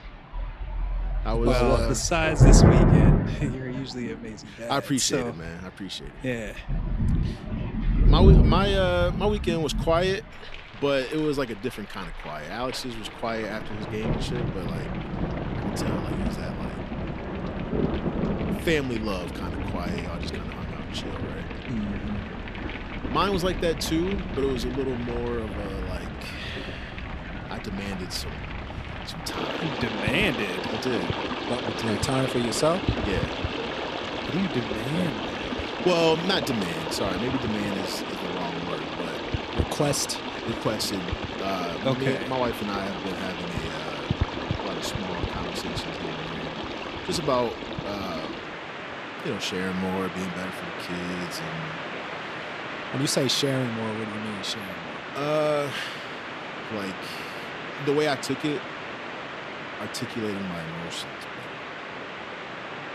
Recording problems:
rain or running water; loud; throughout; 1 dB below the speech

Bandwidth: 13.5 kHz